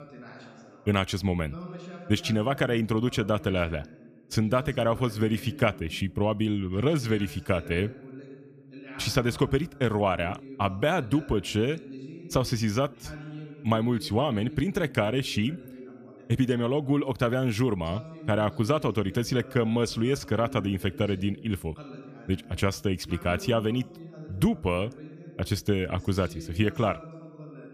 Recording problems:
voice in the background; noticeable; throughout; 15 dB below the speech

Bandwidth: 14.5 kHz